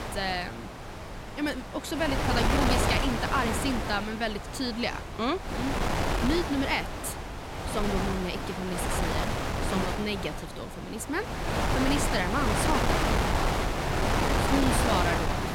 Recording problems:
wind noise on the microphone; heavy; 2 dB above the speech

